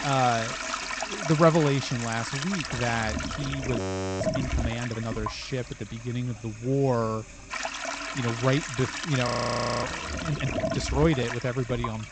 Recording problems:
high frequencies cut off; noticeable; nothing above 8 kHz
household noises; loud; throughout; 4 dB below the speech
audio freezing; at 4 s and at 9.5 s for 0.5 s

